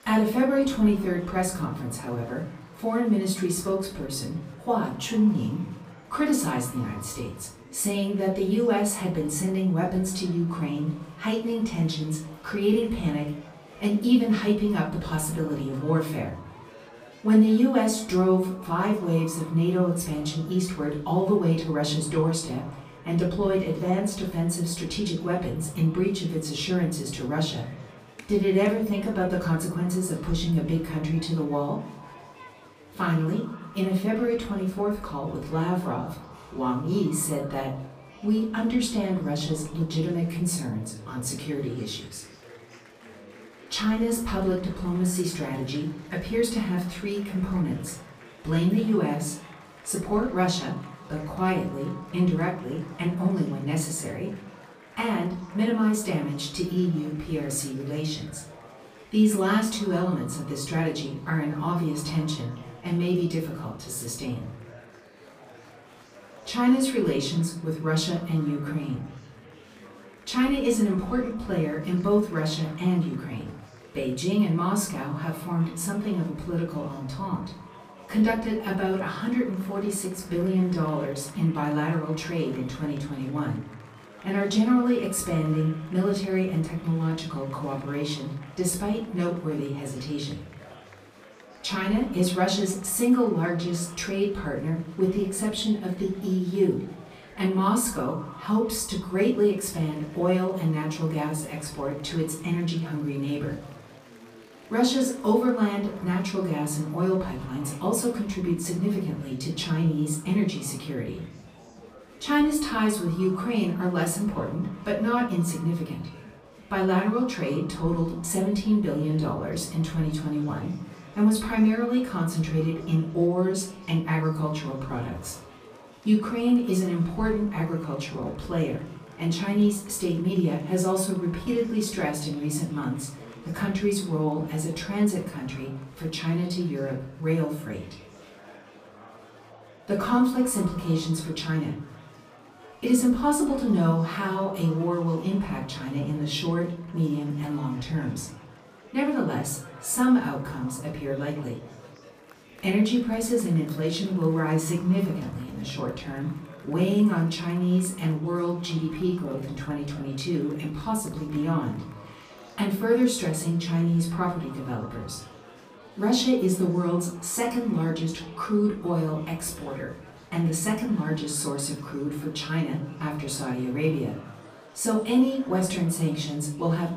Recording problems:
off-mic speech; far
echo of what is said; faint; throughout; 150 ms later, 25 dB below the speech
room echo; slight; dies away in 0.5 s
murmuring crowd; faint; throughout; 20 dB below the speech

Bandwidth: 15 kHz